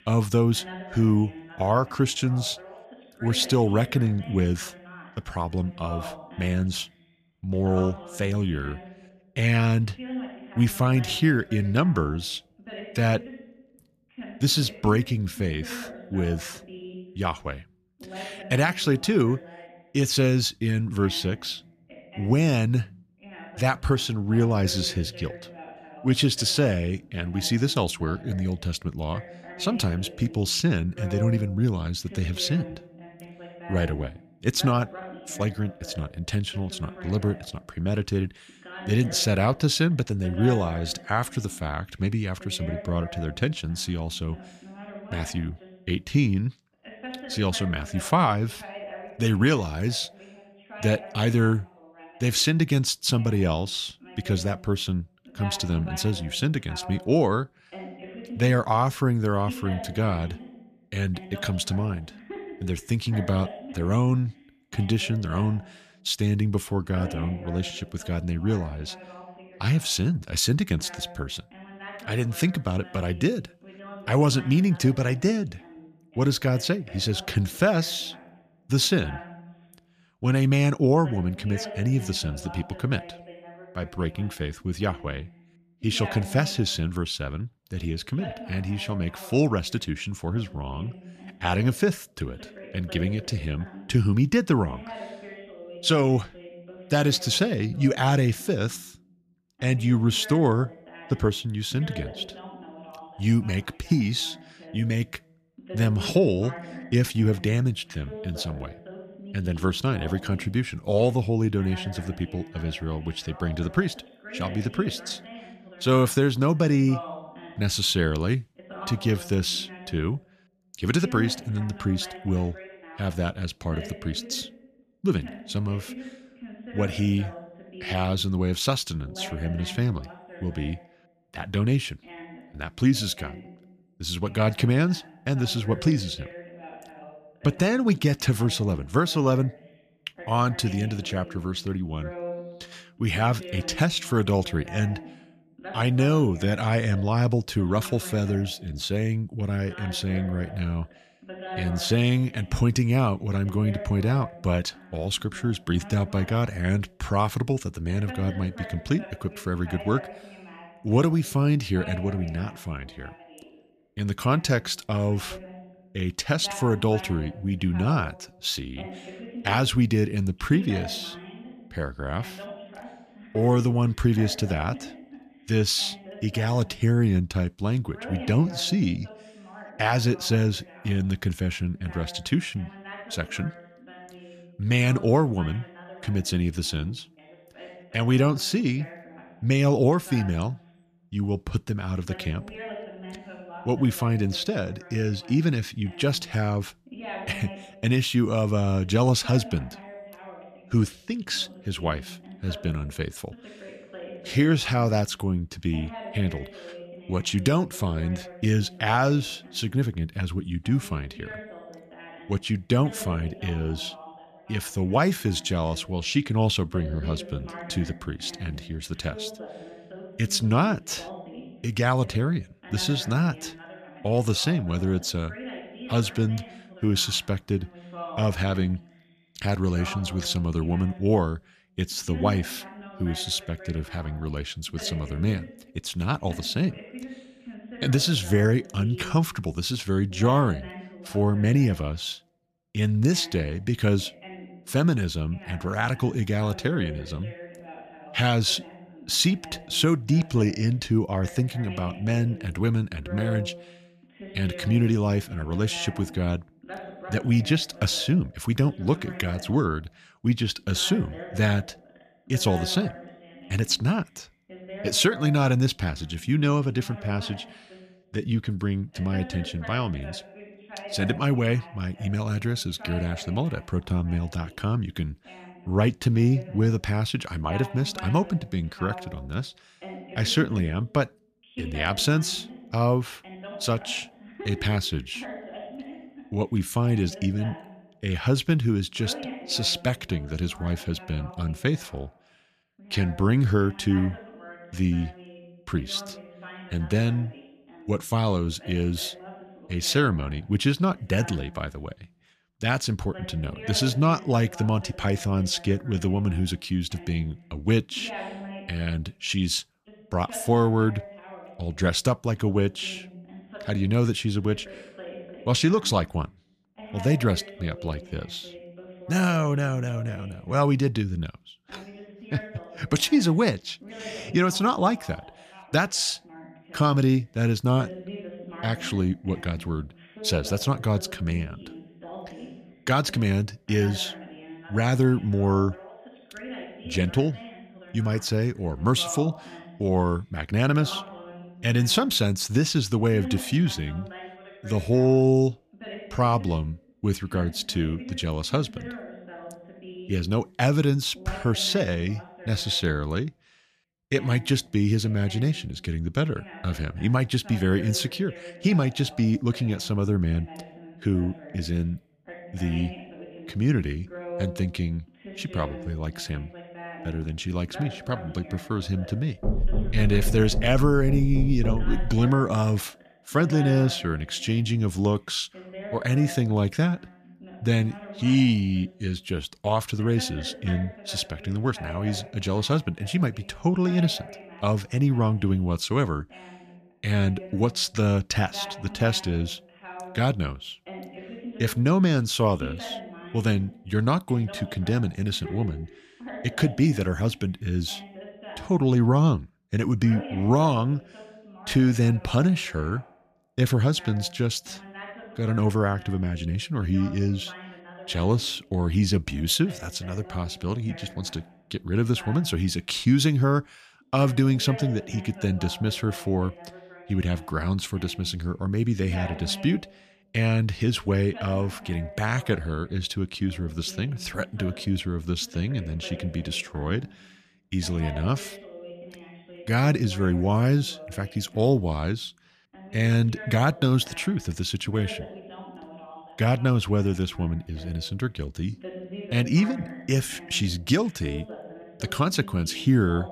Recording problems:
voice in the background; noticeable; throughout; 15 dB below the speech
door banging; noticeable; from 6:09 to 6:12; peak 2 dB below the speech

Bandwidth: 14.5 kHz